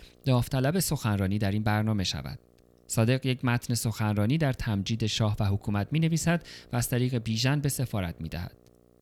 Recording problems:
electrical hum; faint; throughout; 60 Hz, 30 dB below the speech

